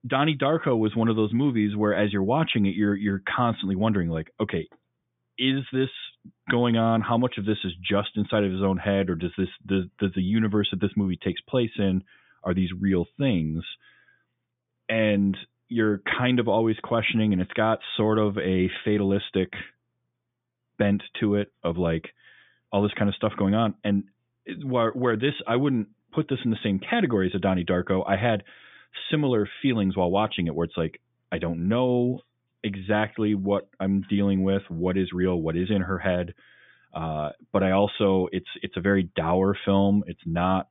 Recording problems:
high frequencies cut off; severe; nothing above 3.5 kHz

